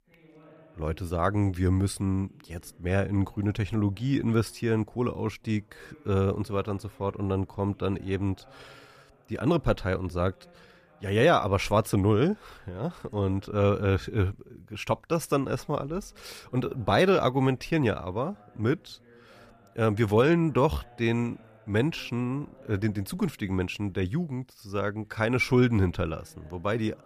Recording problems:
voice in the background; faint; throughout; 30 dB below the speech

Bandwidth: 14.5 kHz